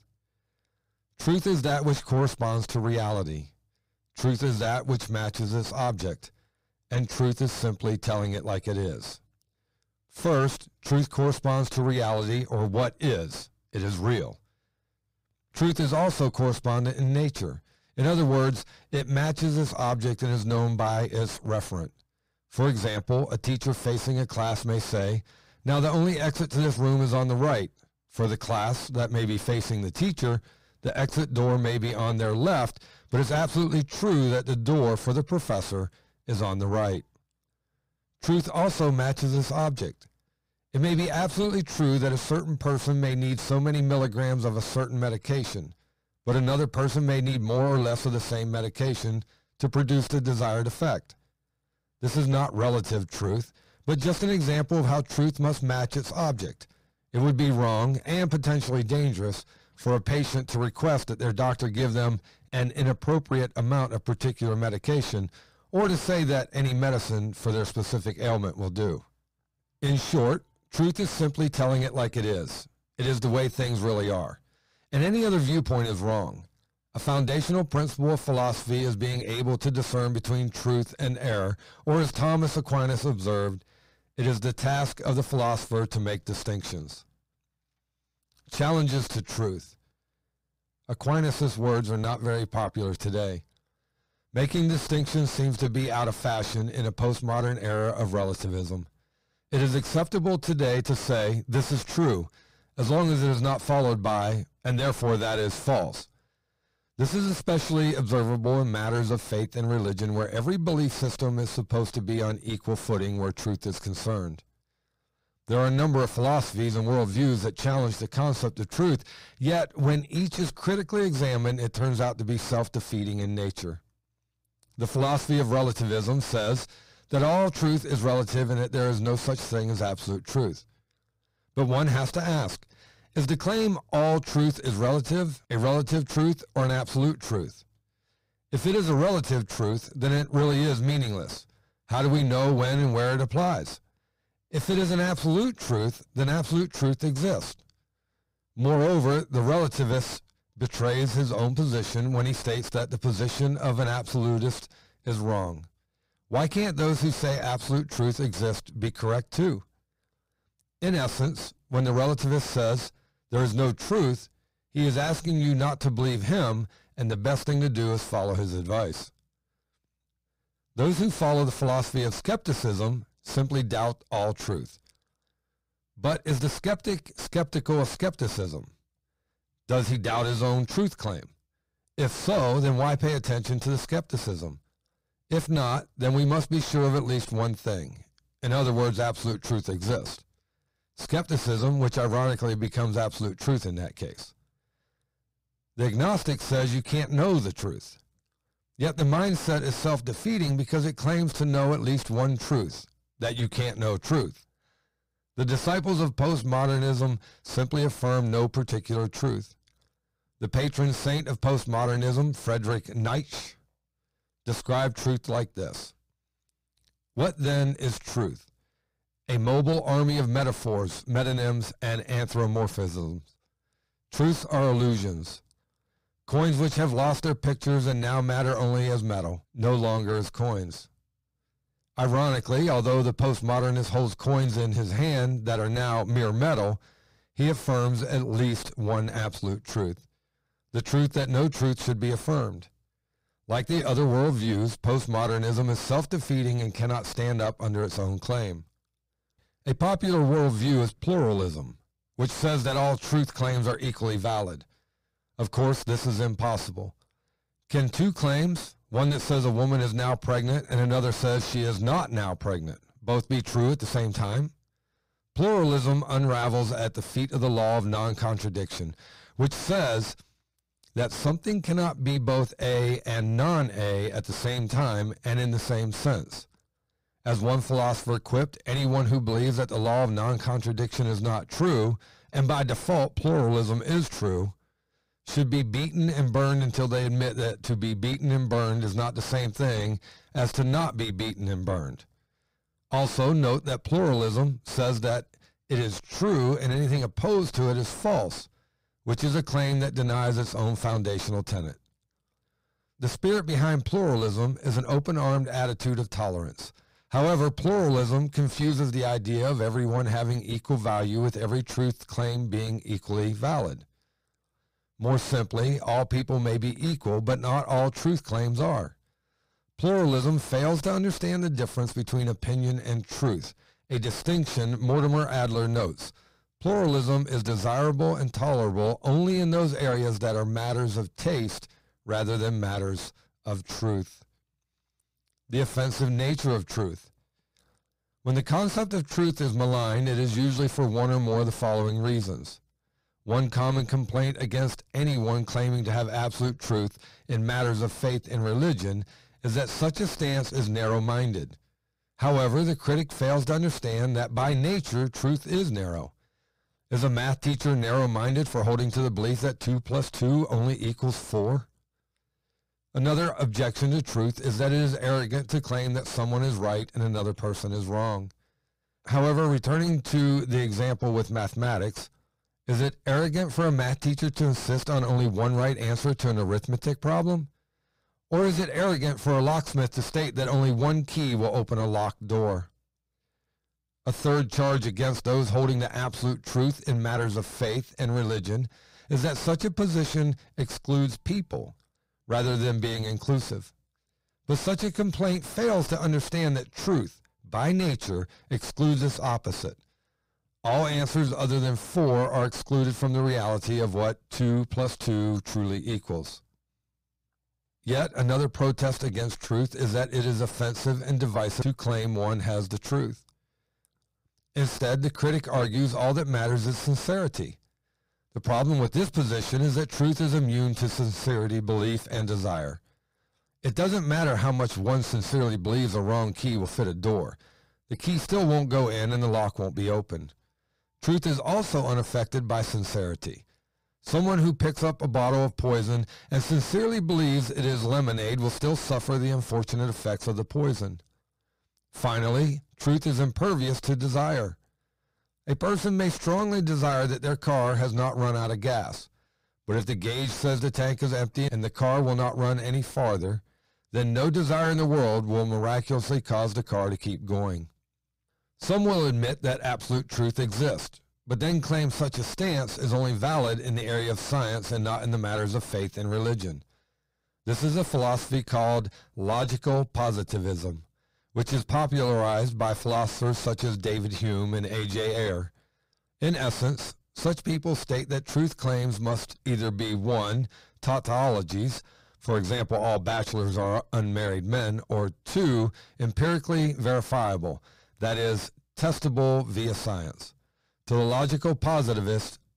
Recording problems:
distortion; heavy; 5 dB below the speech

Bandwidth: 15.5 kHz